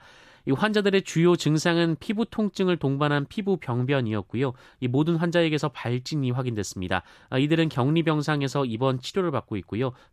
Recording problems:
none

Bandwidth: 14.5 kHz